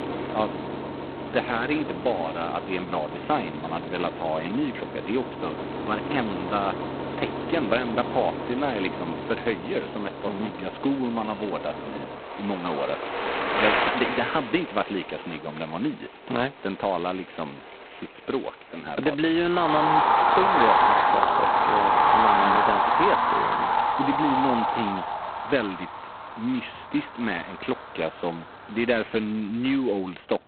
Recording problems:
phone-call audio; poor line; nothing above 4 kHz
traffic noise; very loud; throughout; 3 dB above the speech

